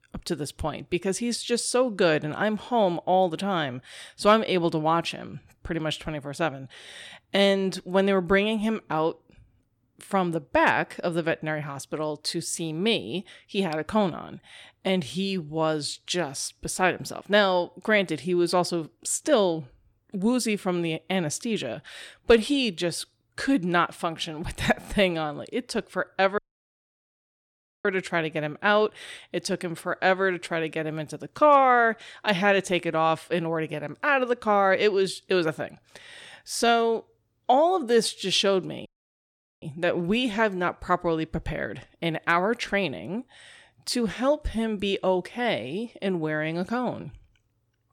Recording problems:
audio cutting out; at 26 s for 1.5 s and at 39 s for 1 s

